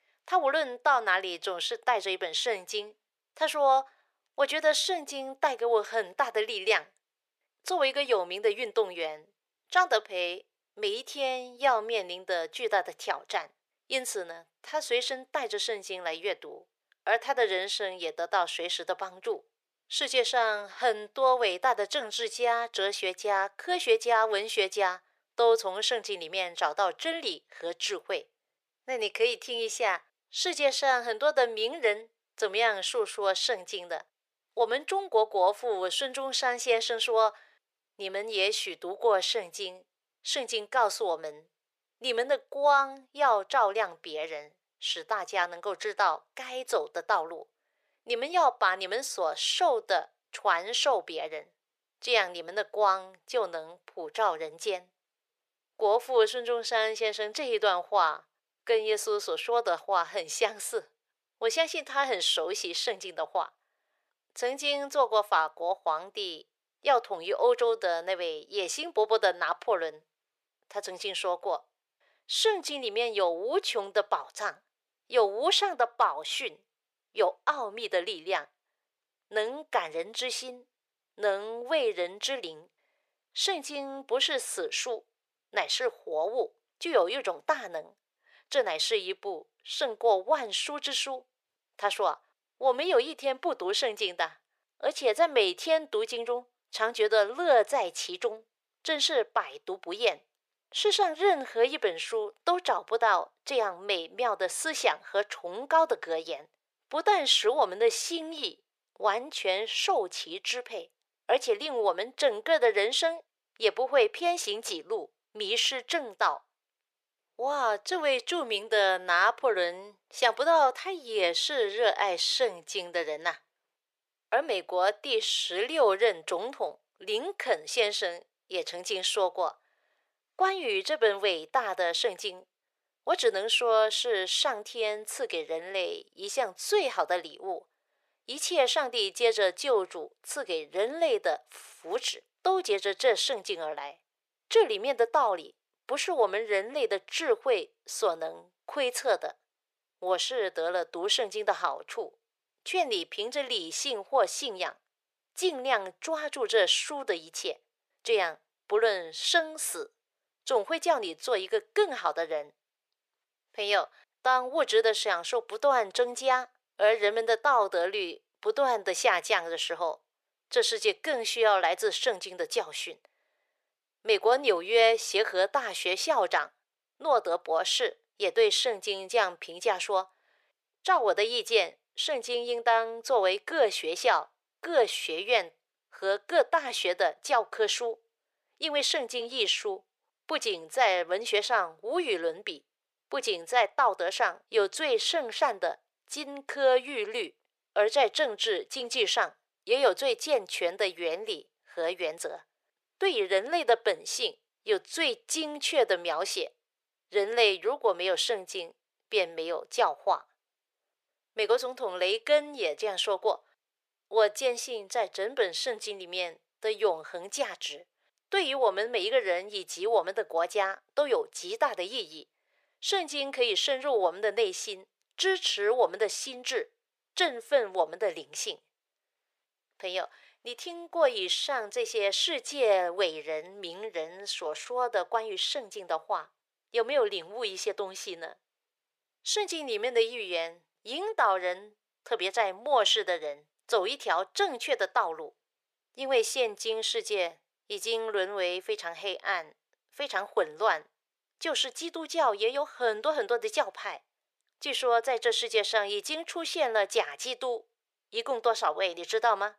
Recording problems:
thin; very; fading below 400 Hz

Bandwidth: 14.5 kHz